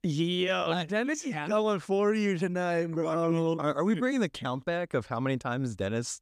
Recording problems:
none

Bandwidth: 14.5 kHz